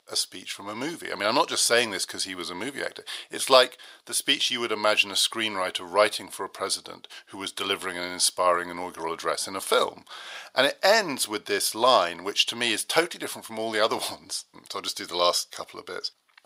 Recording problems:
thin; very; fading below 550 Hz

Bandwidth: 15.5 kHz